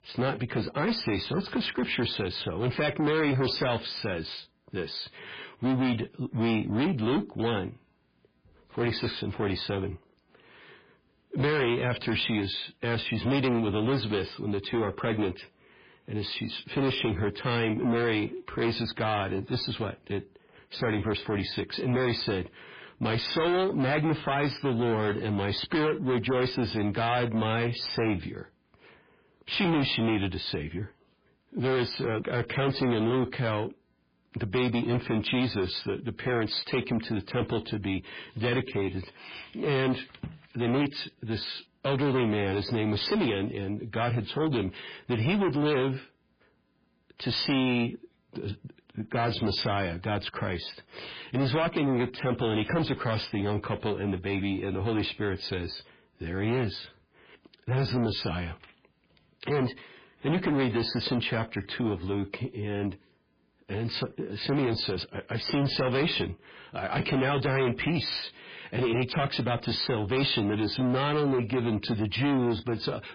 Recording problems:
distortion; heavy; 7 dB below the speech
garbled, watery; badly

